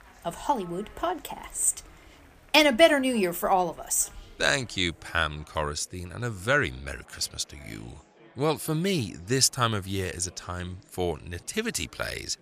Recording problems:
chatter from many people; faint; throughout; 30 dB below the speech

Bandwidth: 15 kHz